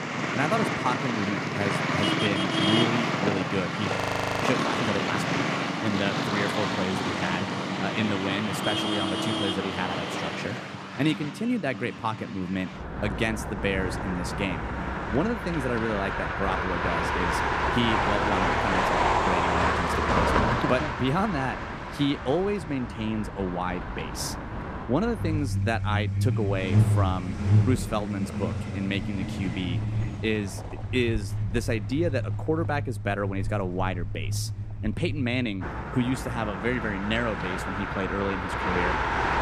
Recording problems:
traffic noise; very loud; throughout; 2 dB above the speech
audio freezing; at 4 s

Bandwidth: 15 kHz